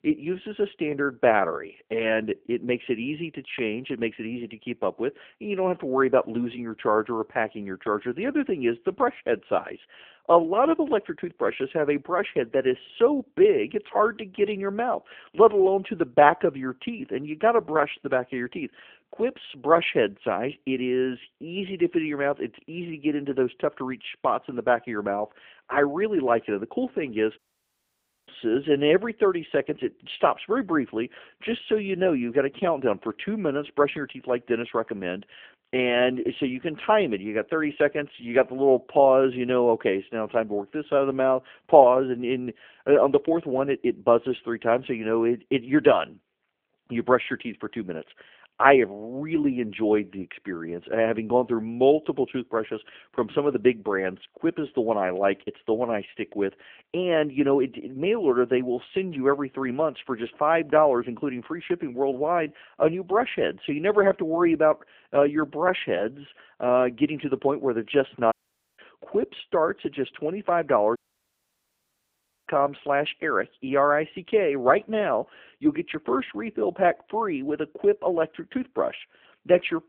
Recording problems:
phone-call audio
audio cutting out; at 27 s for 1 s, at 1:08 and at 1:11 for 1.5 s

